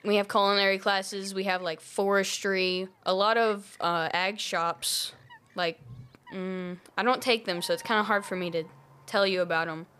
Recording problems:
animal sounds; faint; throughout; 25 dB below the speech

